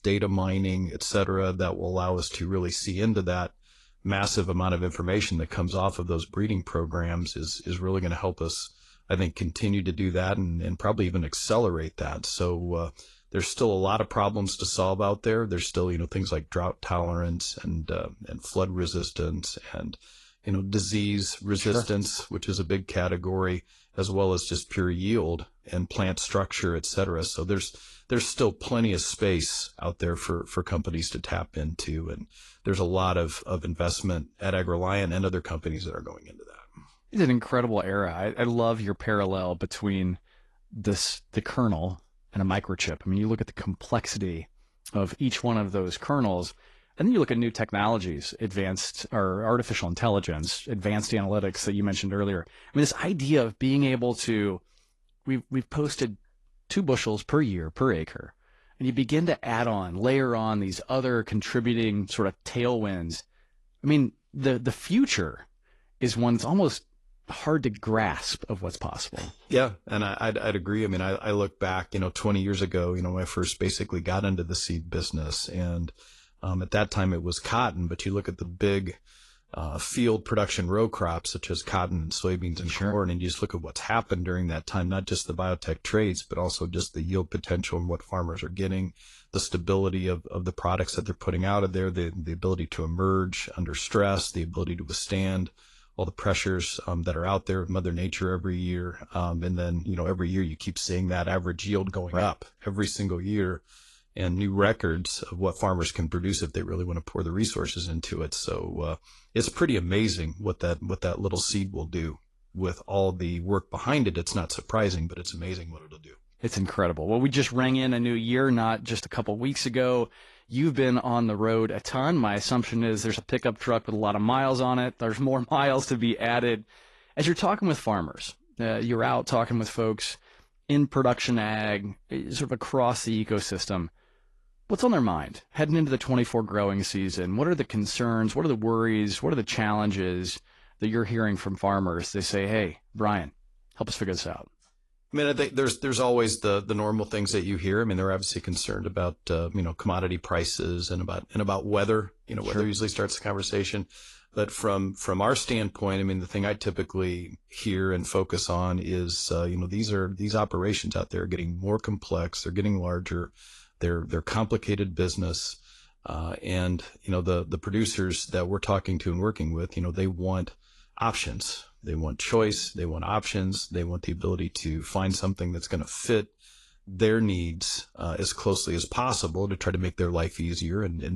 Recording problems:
garbled, watery; slightly; nothing above 11 kHz
abrupt cut into speech; at the end

